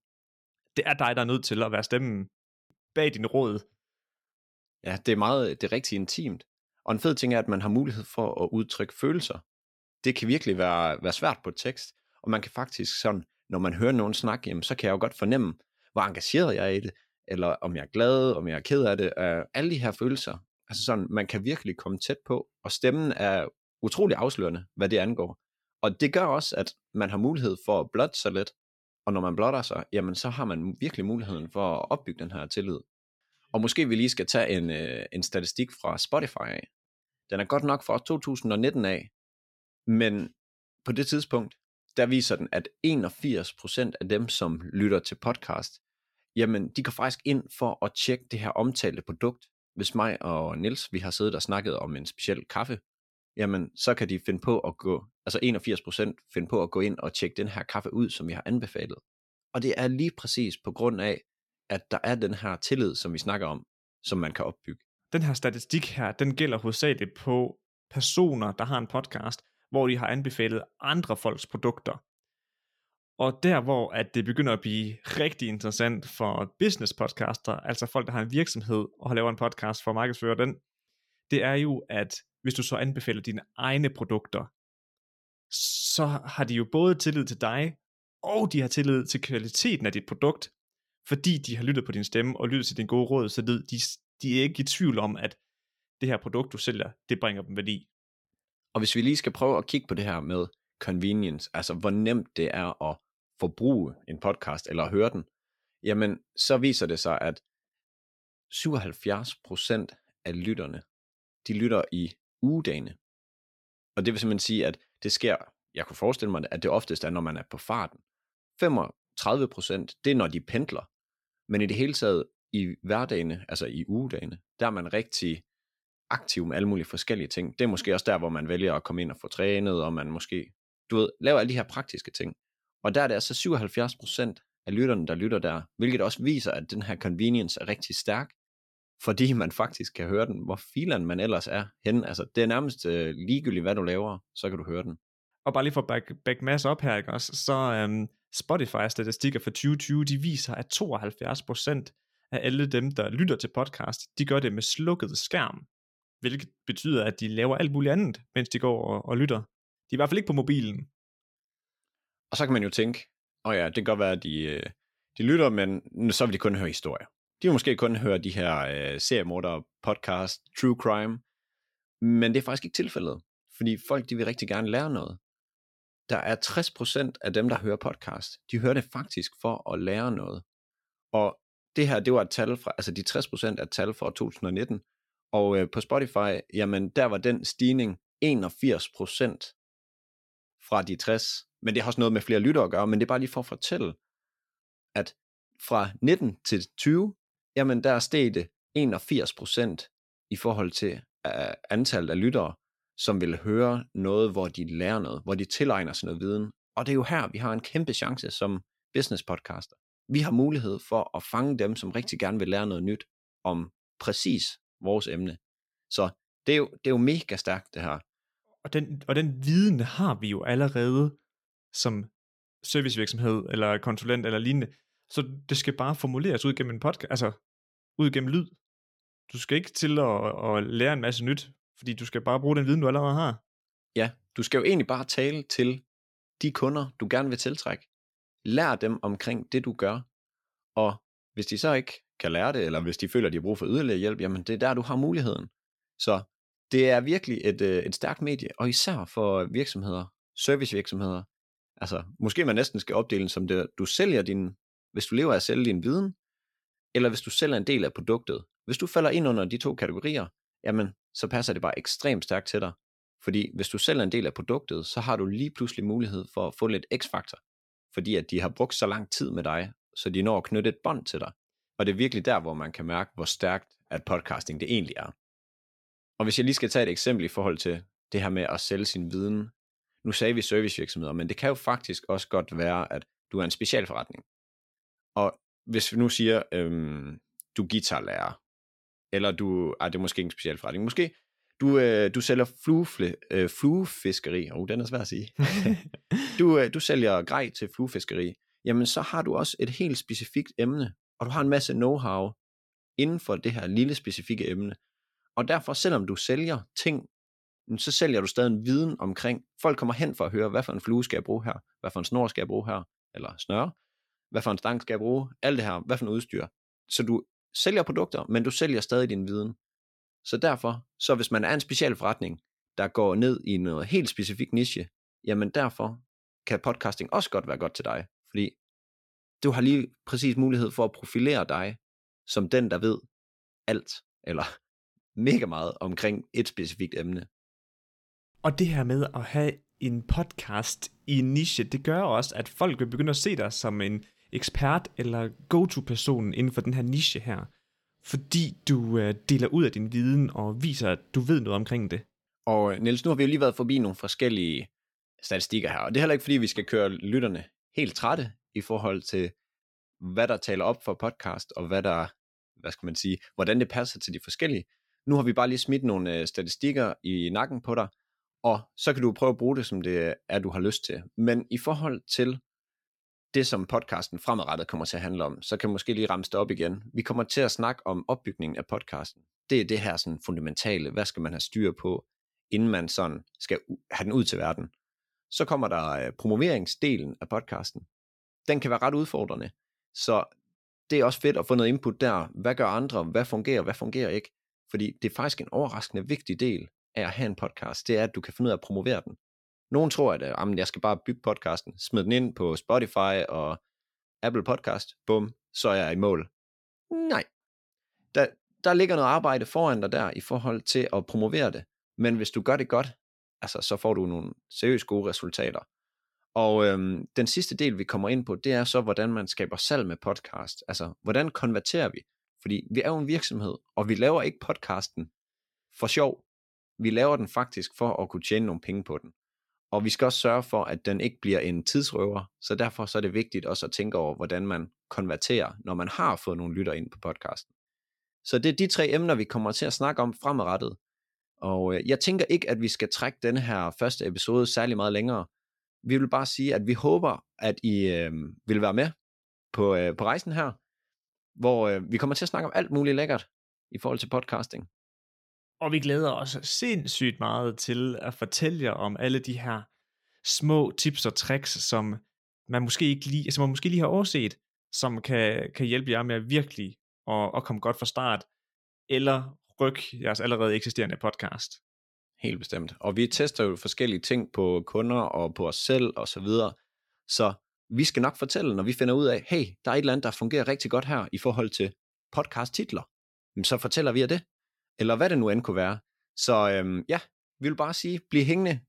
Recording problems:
none

